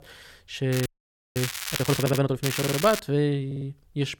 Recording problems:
crackling; loud; from 0.5 to 2 s and at 2.5 s; 5 dB below the speech
audio freezing; at 1 s for 0.5 s
audio stuttering; at 2 s, at 2.5 s and at 3.5 s

